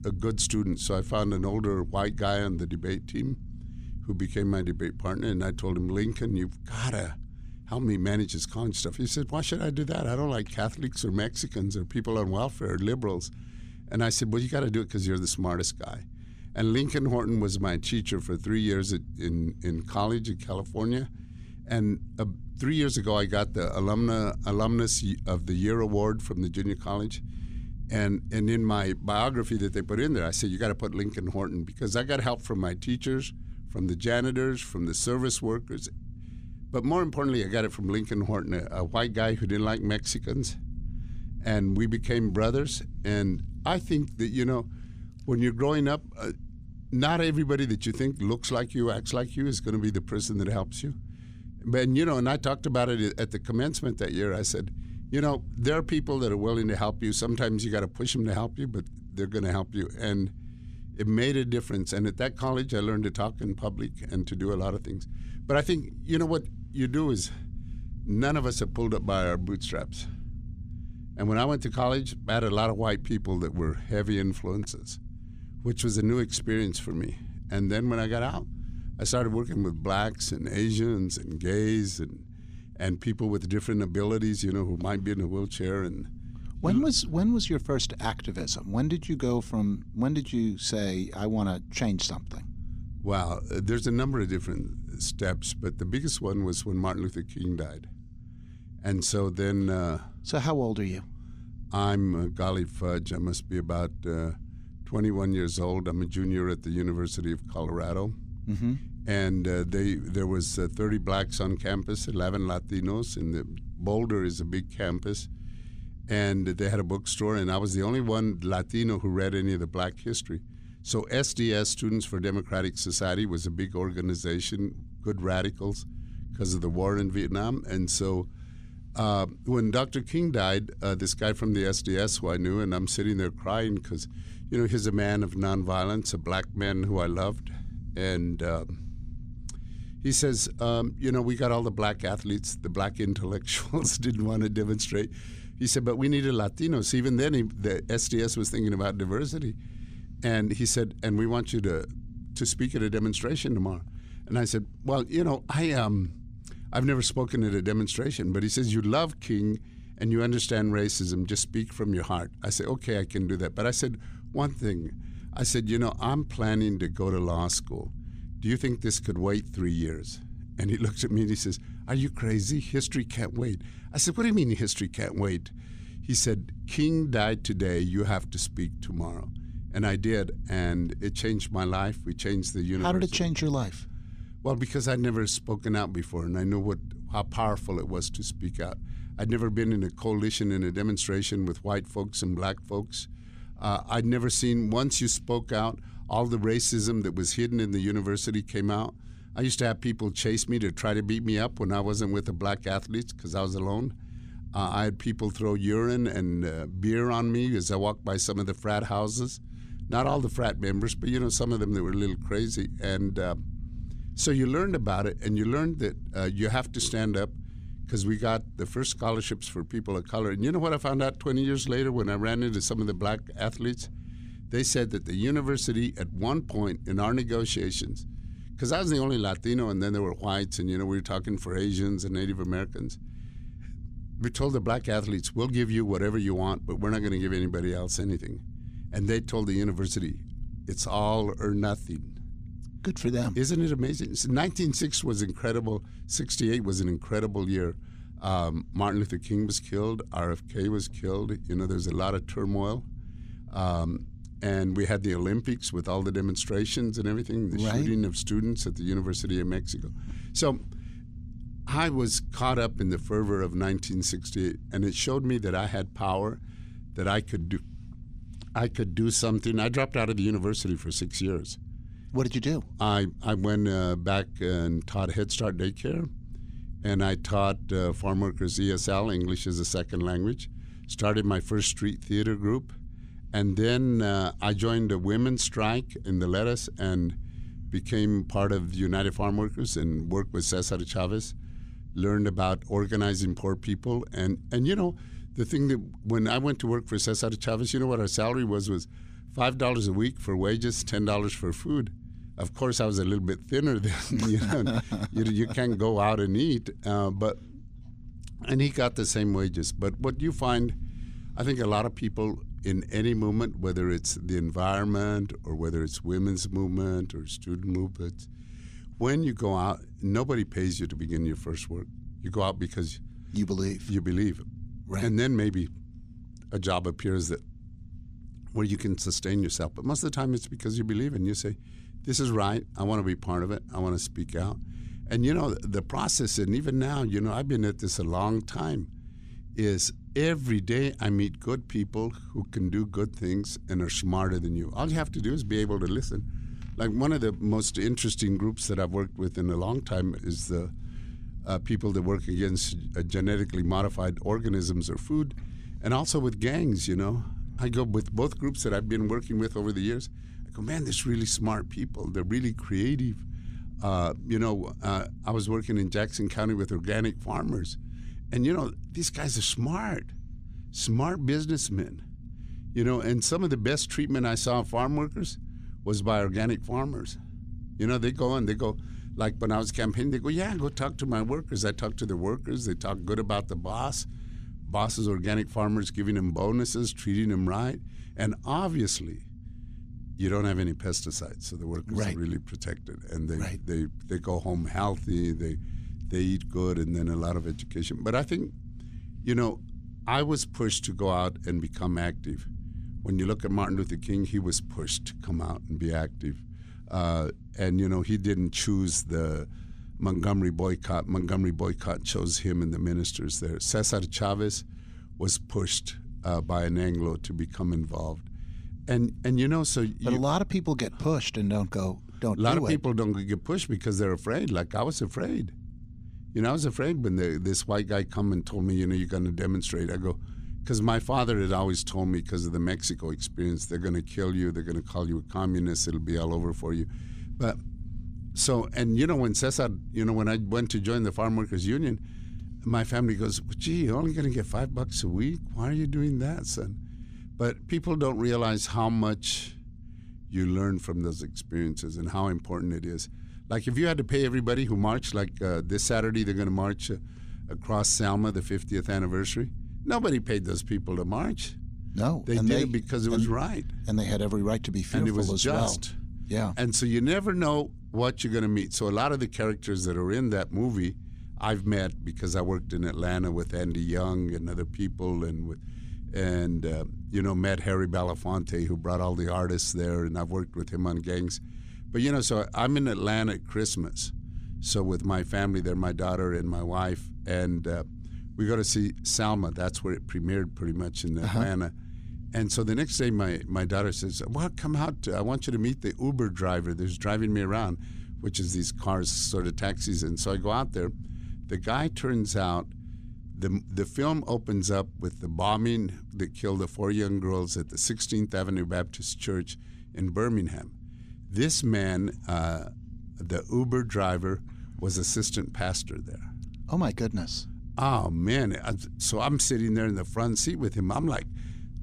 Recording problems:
low rumble; faint; throughout; 25 dB below the speech

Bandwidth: 15 kHz